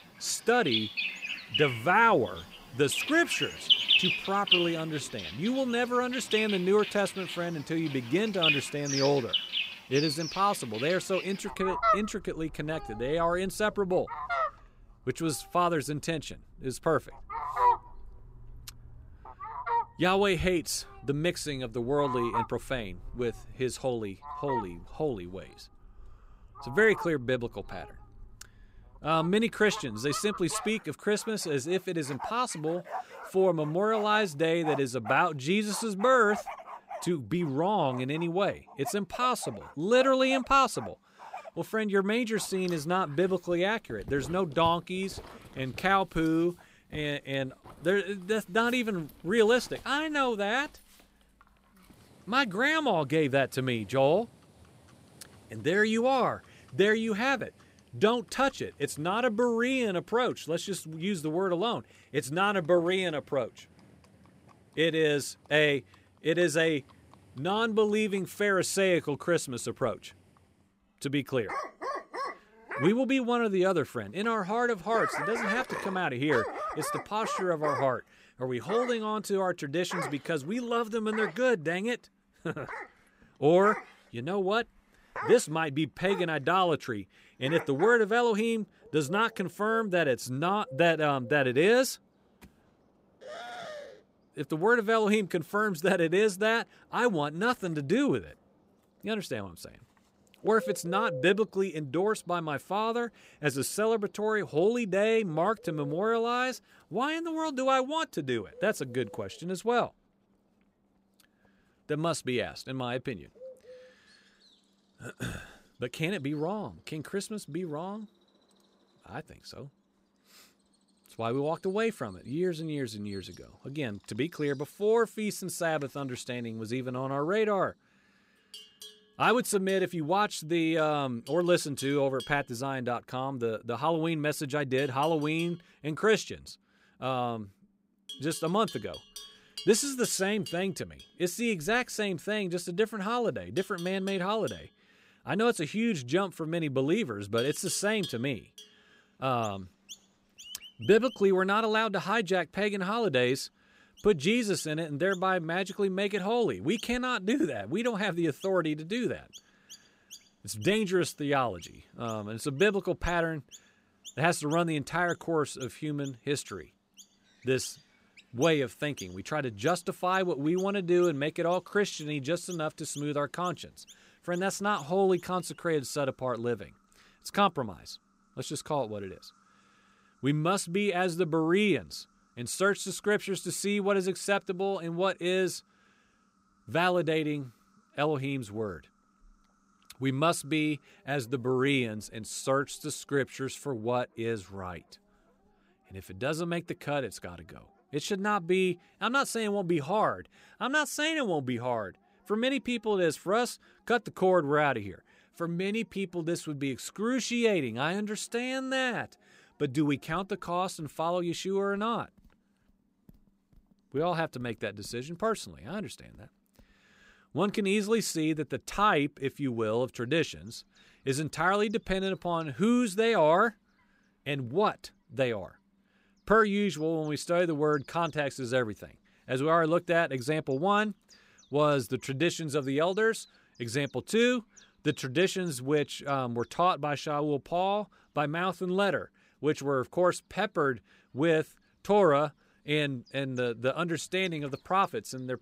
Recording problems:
animal sounds; loud; throughout; 7 dB below the speech

